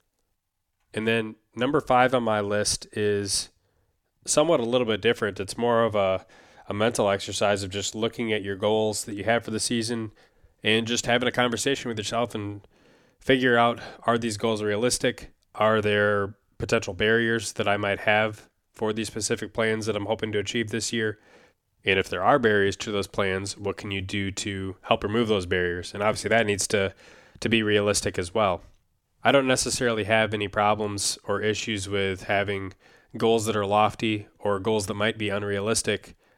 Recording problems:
none

